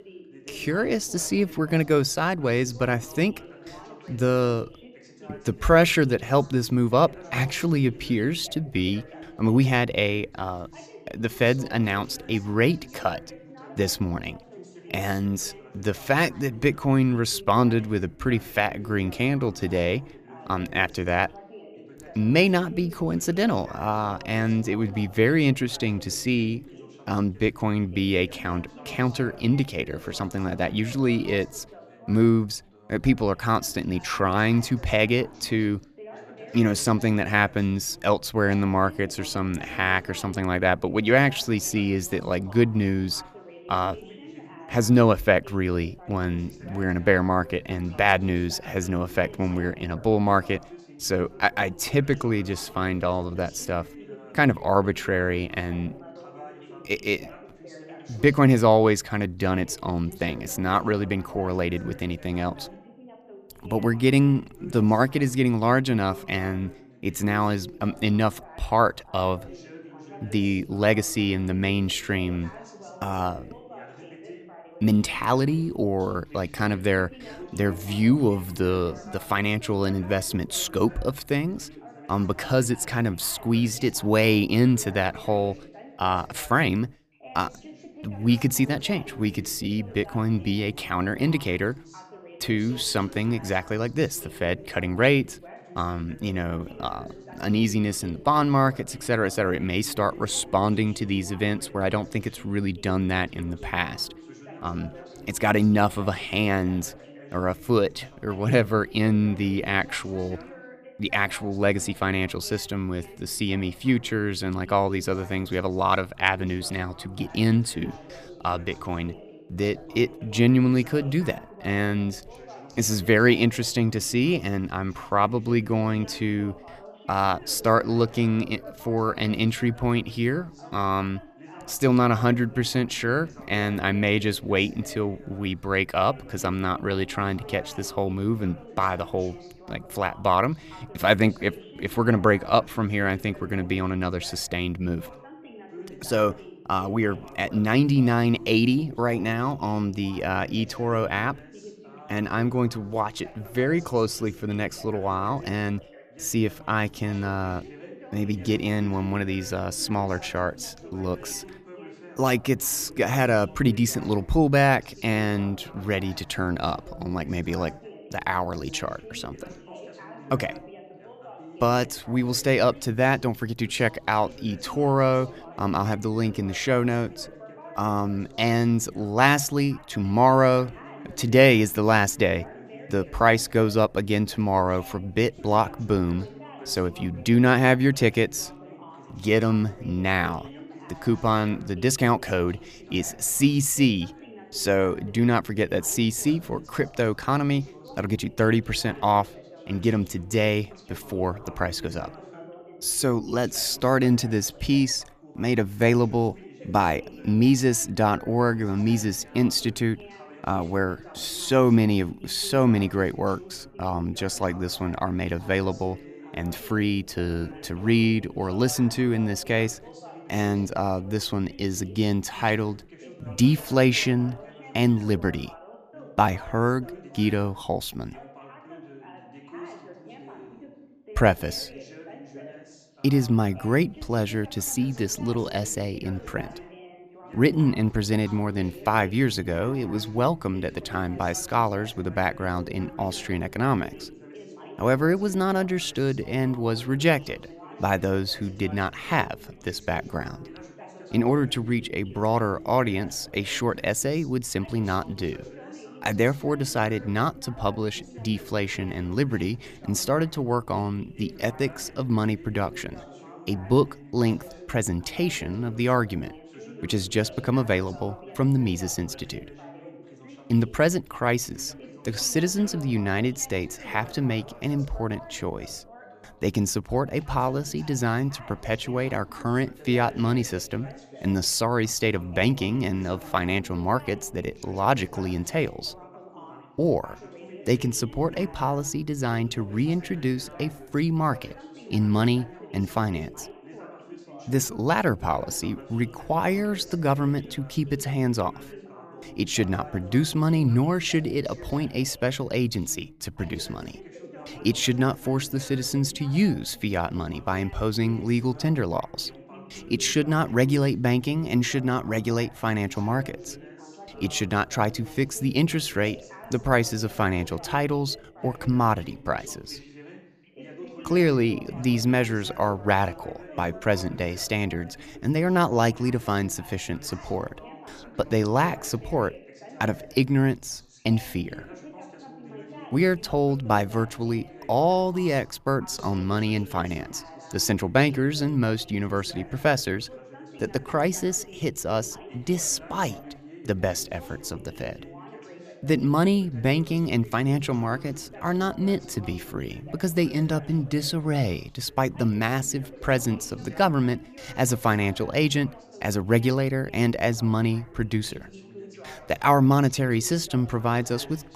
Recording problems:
background chatter; noticeable; throughout; 2 voices, 20 dB below the speech

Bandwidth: 14.5 kHz